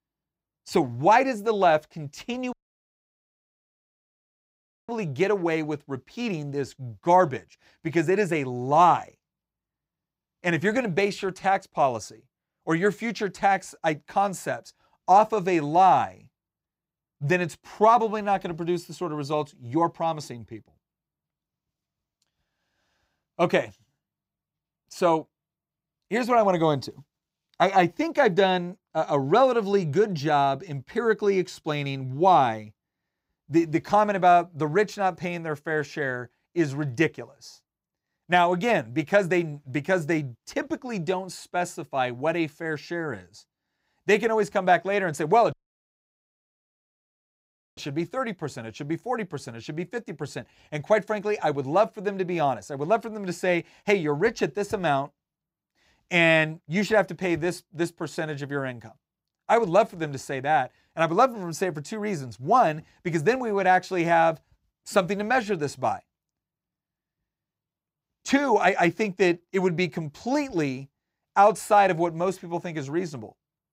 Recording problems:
audio cutting out; at 2.5 s for 2.5 s and at 46 s for 2 s

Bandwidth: 15.5 kHz